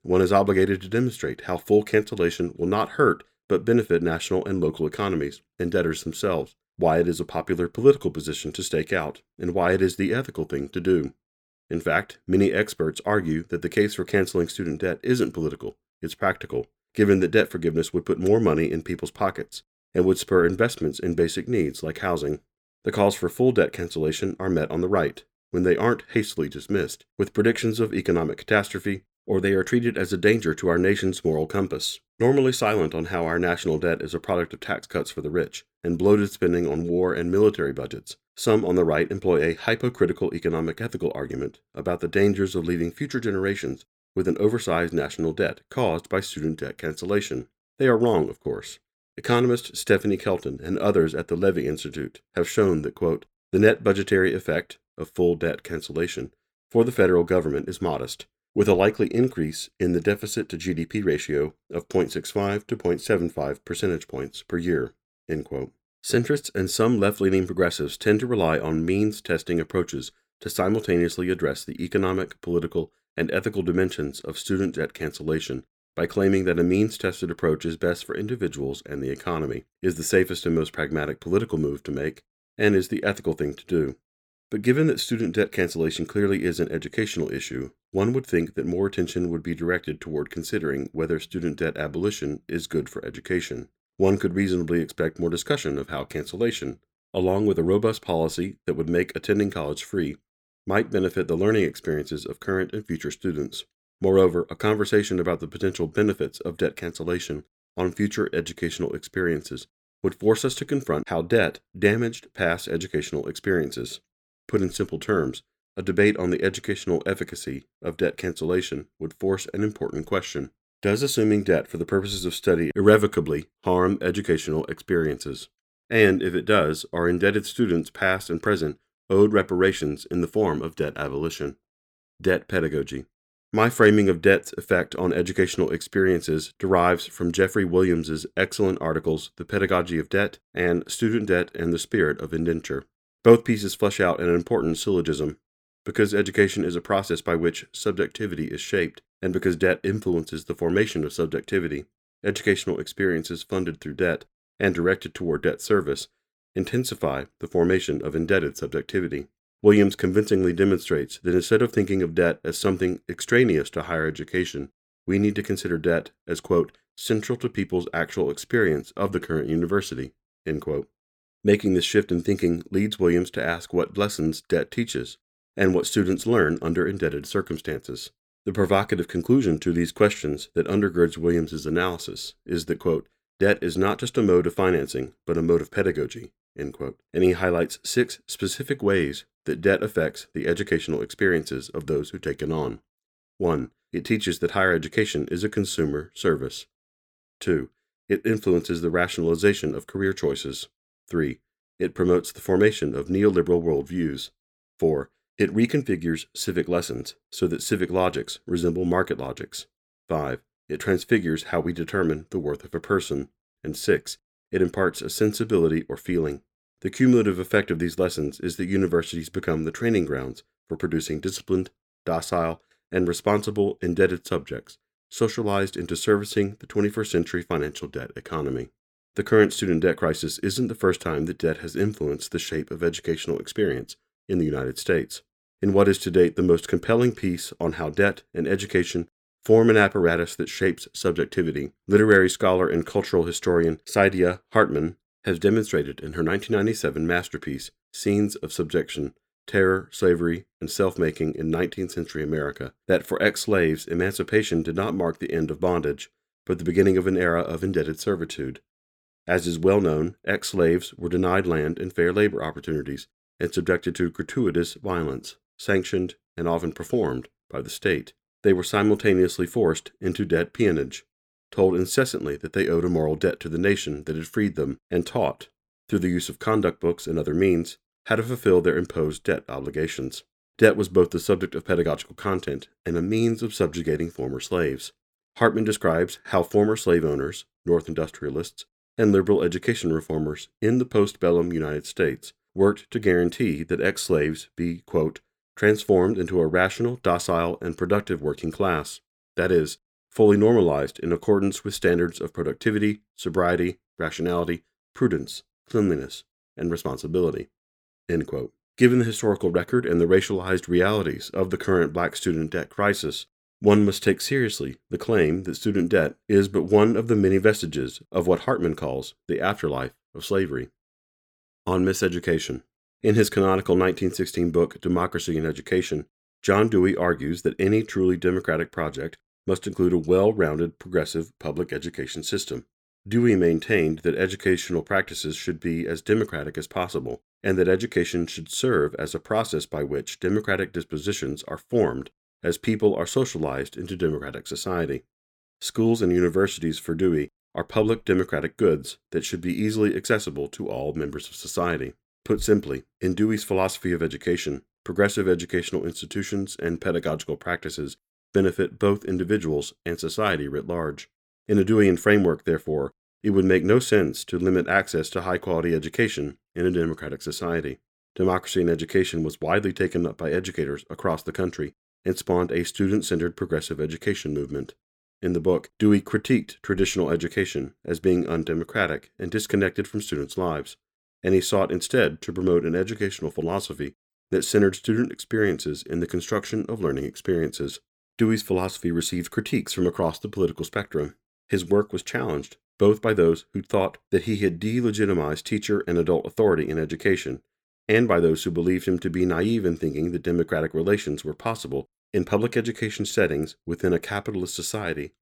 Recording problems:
none

